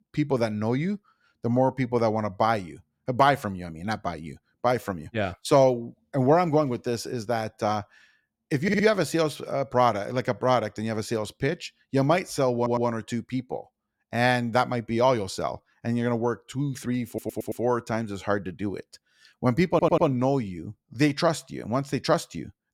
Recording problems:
audio stuttering; 4 times, first at 8.5 s

